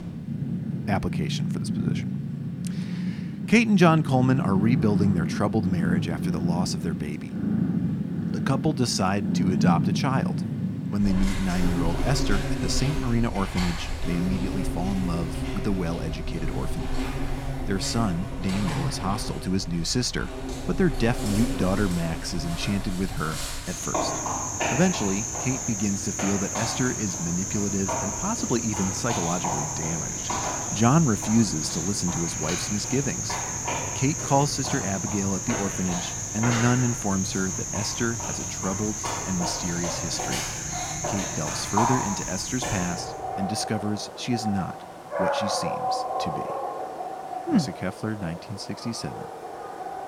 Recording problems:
animal sounds; loud; throughout; 2 dB below the speech

